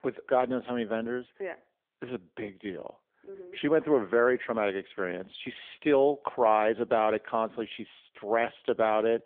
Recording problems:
phone-call audio; nothing above 3.5 kHz

